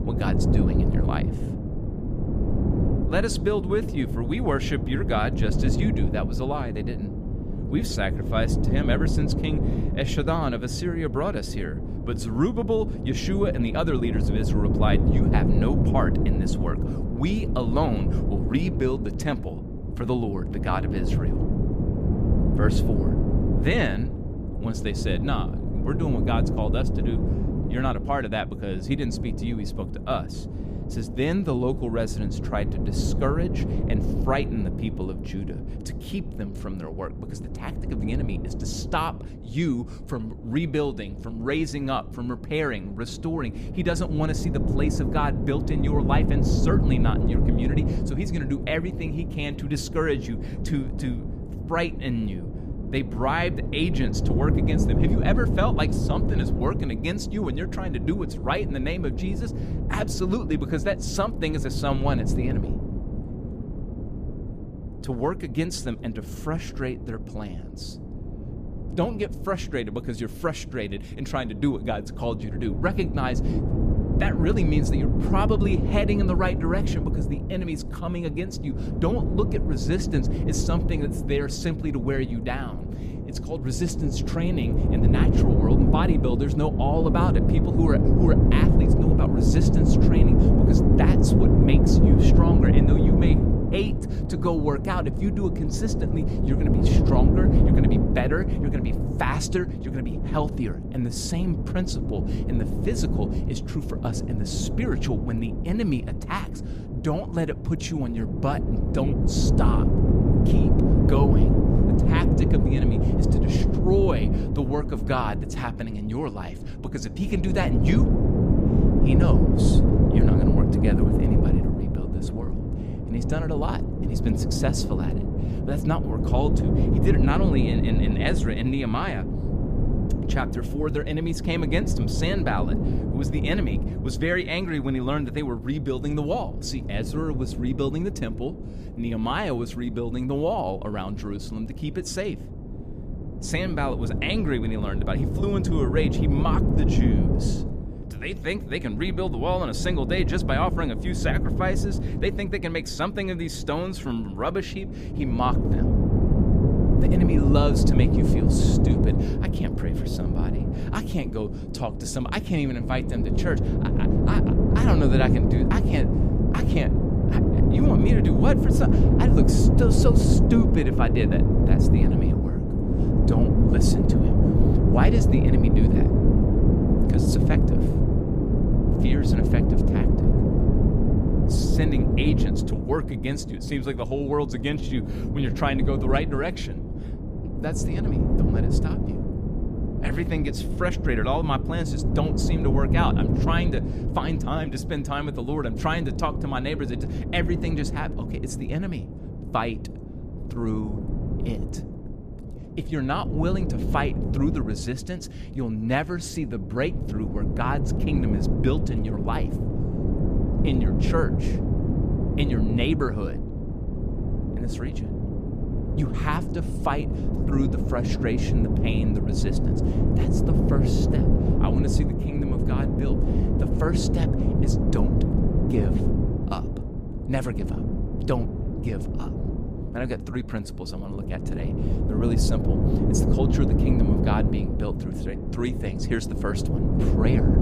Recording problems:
wind noise on the microphone; heavy; 2 dB below the speech

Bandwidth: 14.5 kHz